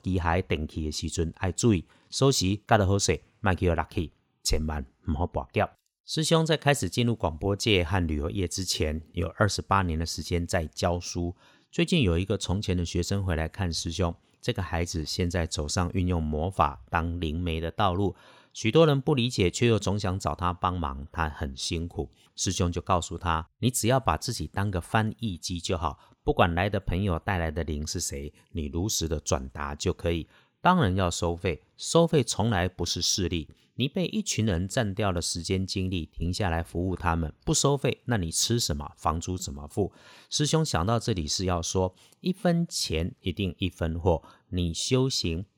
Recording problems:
none

